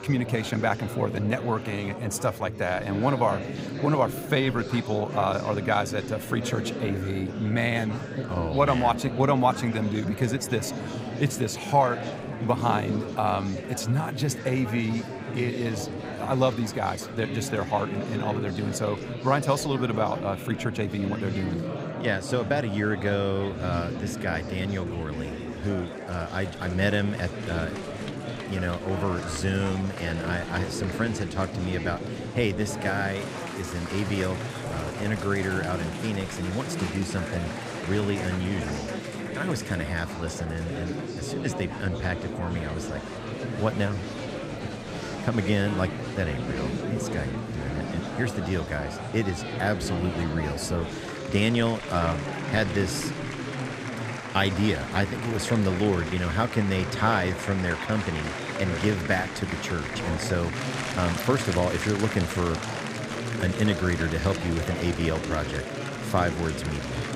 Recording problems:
murmuring crowd; loud; throughout; 5 dB below the speech

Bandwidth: 15.5 kHz